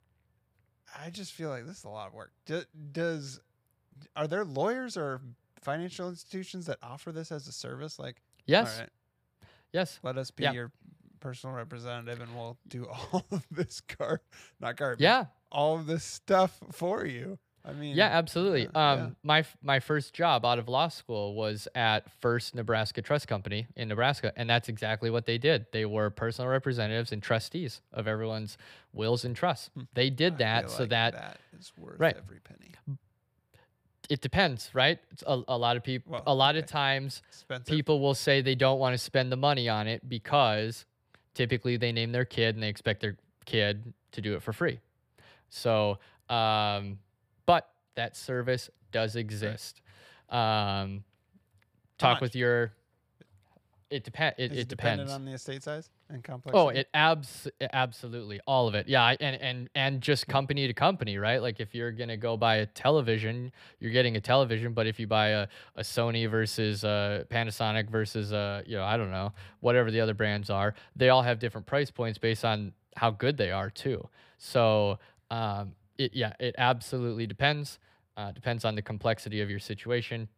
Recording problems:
none

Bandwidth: 15 kHz